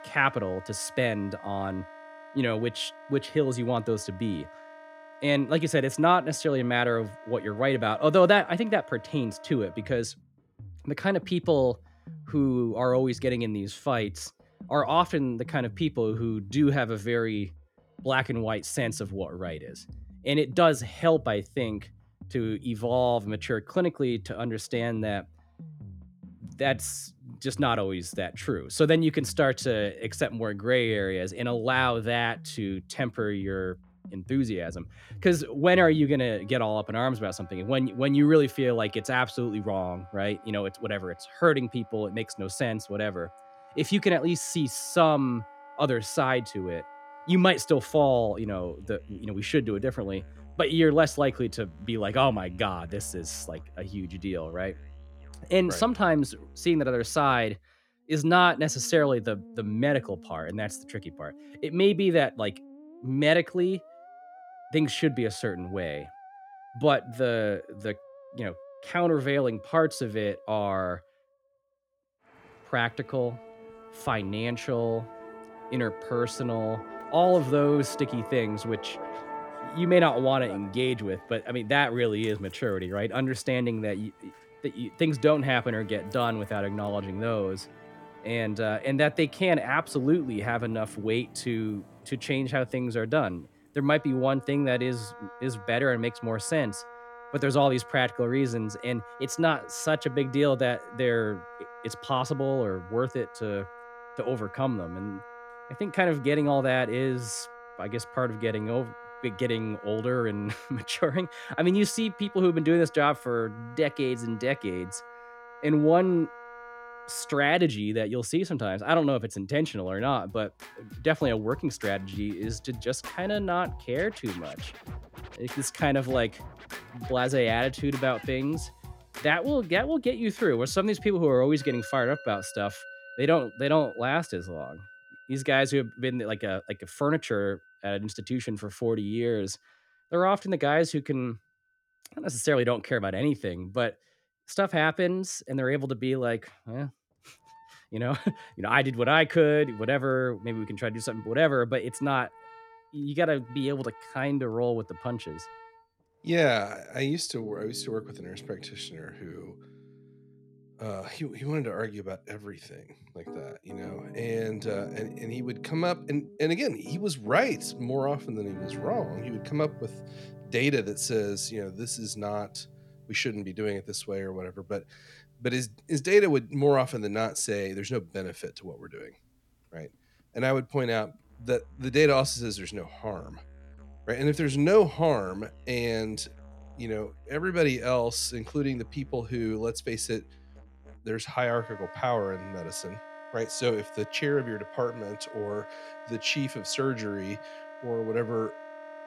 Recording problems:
background music; noticeable; throughout; 20 dB below the speech

